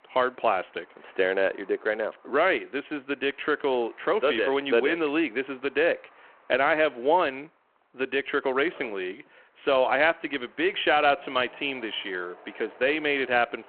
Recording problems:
phone-call audio
traffic noise; faint; throughout; 30 dB below the speech

